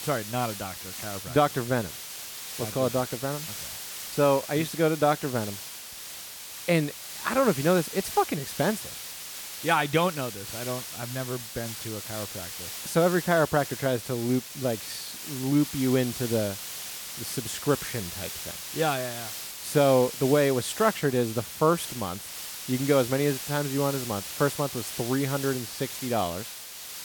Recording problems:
hiss; loud; throughout; 8 dB below the speech

